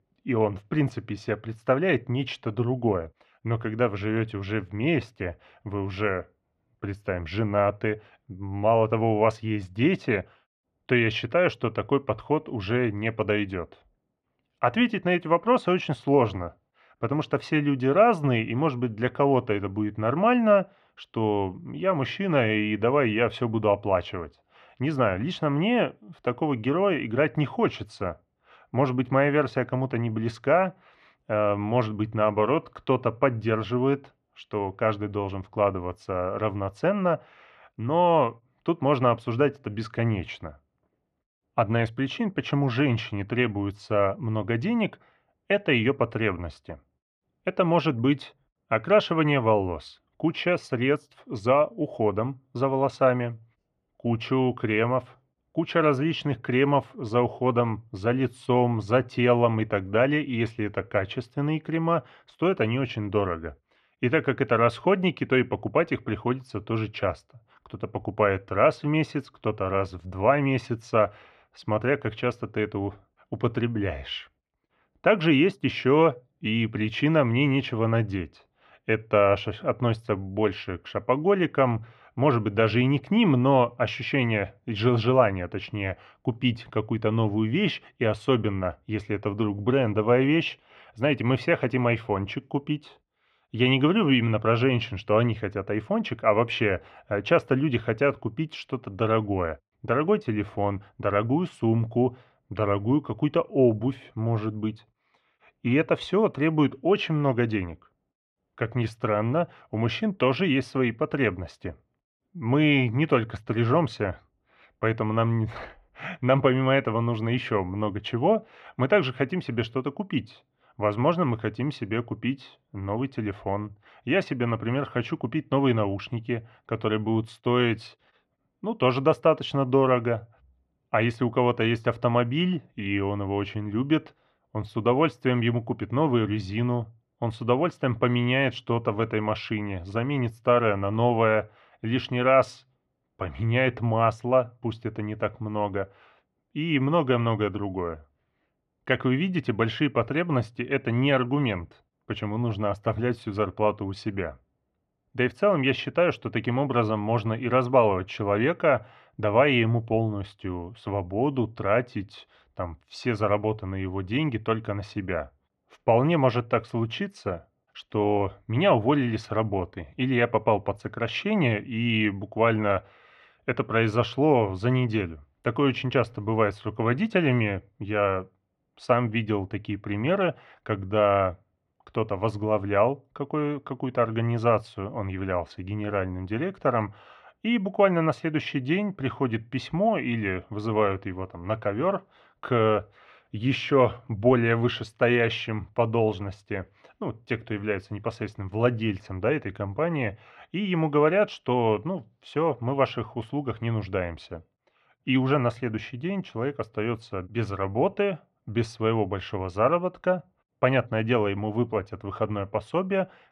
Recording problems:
muffled; very; fading above 2.5 kHz

